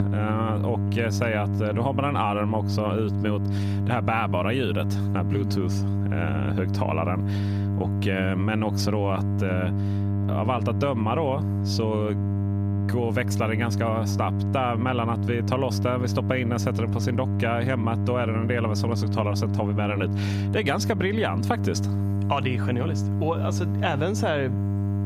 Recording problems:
squashed, flat; somewhat
electrical hum; loud; throughout; 50 Hz, 9 dB below the speech

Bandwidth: 15.5 kHz